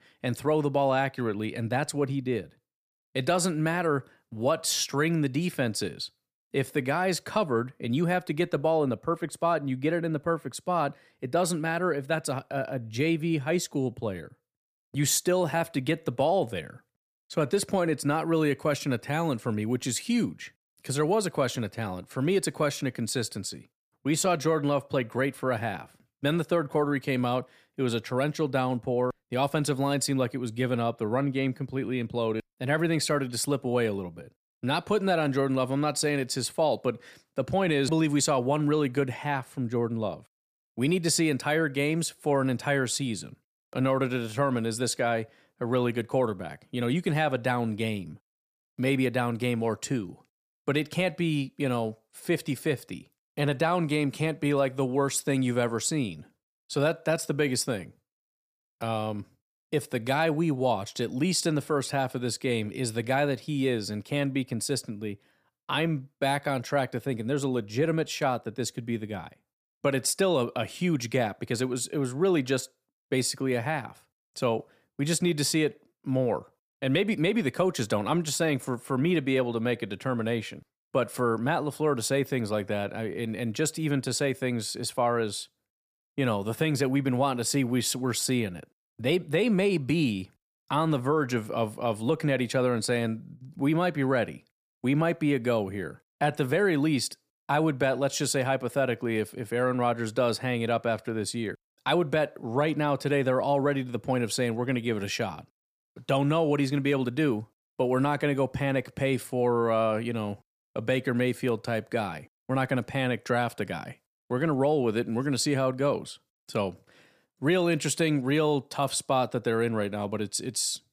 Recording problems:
none

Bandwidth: 15 kHz